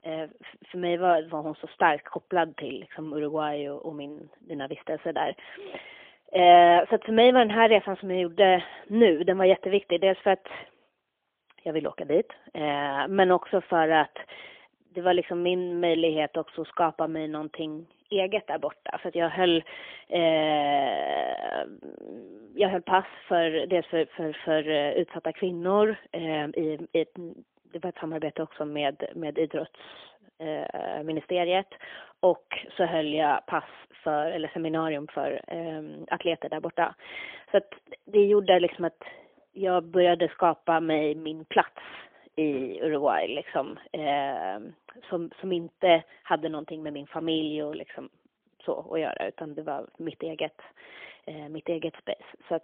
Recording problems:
phone-call audio; poor line; nothing above 3.5 kHz

